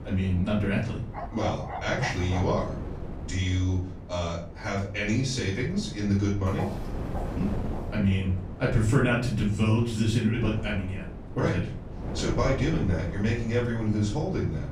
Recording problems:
off-mic speech; far
room echo; slight; dies away in 0.4 s
wind noise on the microphone; occasional gusts; 15 dB below the speech
dog barking; noticeable; from 1 to 2.5 s; peak 8 dB below the speech
footsteps; faint; from 6.5 to 8 s; peak 10 dB below the speech

